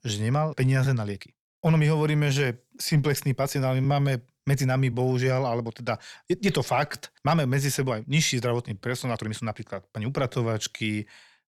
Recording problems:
uneven, jittery; strongly; from 0.5 to 11 s

